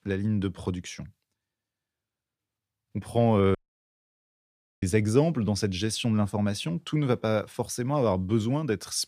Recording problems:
audio cutting out; at 3.5 s for 1.5 s

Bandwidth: 15 kHz